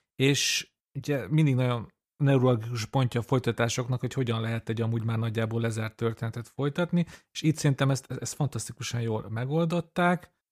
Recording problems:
none

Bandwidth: 15 kHz